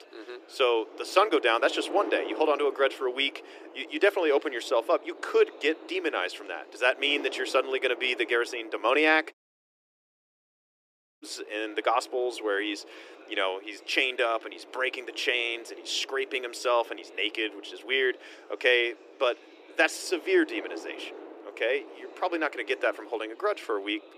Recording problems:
thin; very; fading below 300 Hz
wind noise on the microphone; occasional gusts; 20 dB below the speech
chatter from many people; faint; throughout; 30 dB below the speech
audio cutting out; at 9.5 s for 2 s

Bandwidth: 14.5 kHz